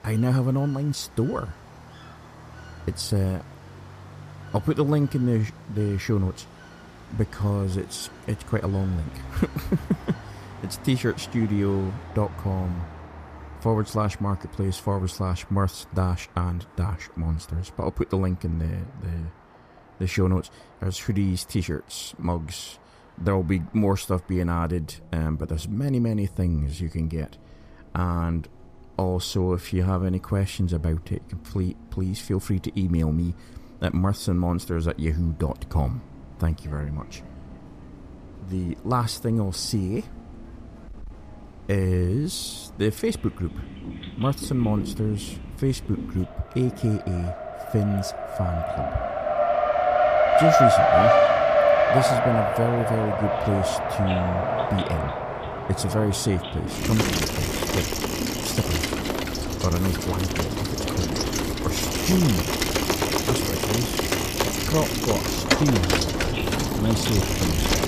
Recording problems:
traffic noise; very loud; throughout; 3 dB above the speech
animal sounds; noticeable; throughout; 15 dB below the speech

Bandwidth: 14.5 kHz